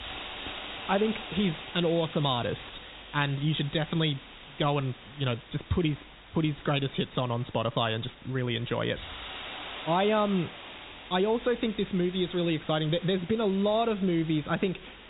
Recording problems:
high frequencies cut off; severe; nothing above 4 kHz
hiss; noticeable; throughout; 15 dB below the speech

